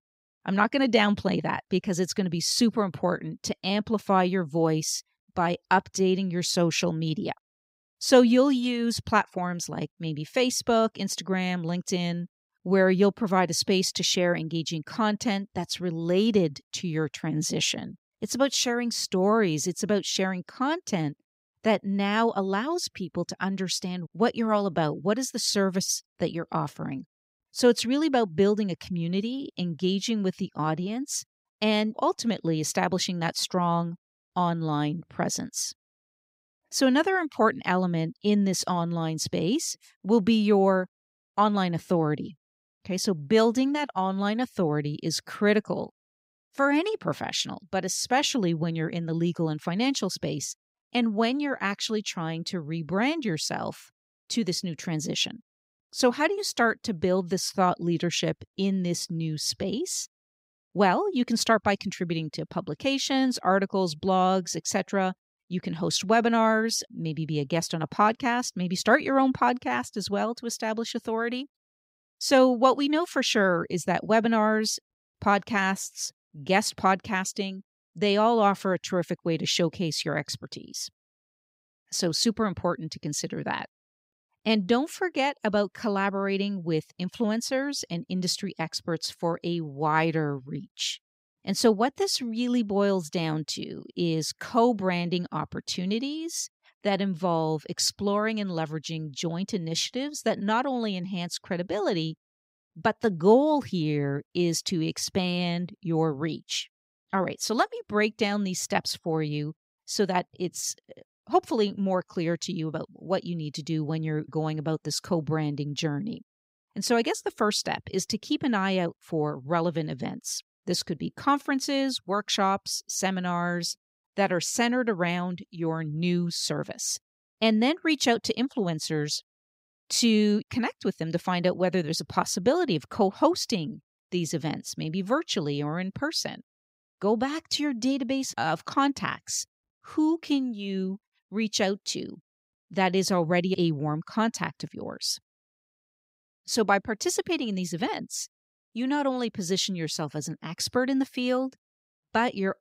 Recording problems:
none

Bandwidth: 15.5 kHz